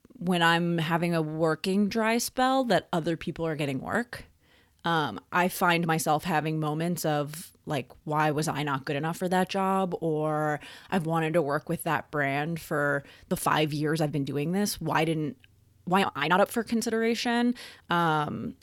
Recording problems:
uneven, jittery; strongly; from 1.5 to 18 s

